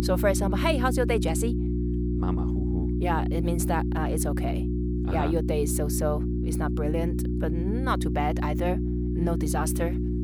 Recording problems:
electrical hum; loud; throughout; 60 Hz, 5 dB below the speech

